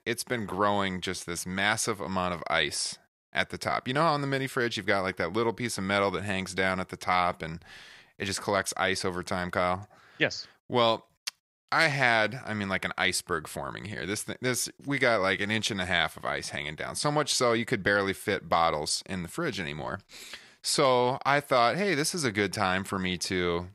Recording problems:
none

